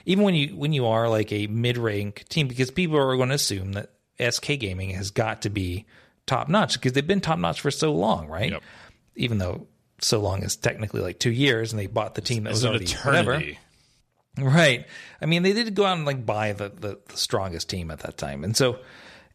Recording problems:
none

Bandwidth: 14 kHz